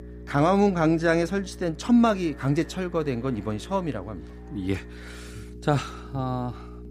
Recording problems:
electrical hum; faint; throughout; 60 Hz, 20 dB below the speech
alarms or sirens; faint; throughout; 25 dB below the speech

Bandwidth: 15 kHz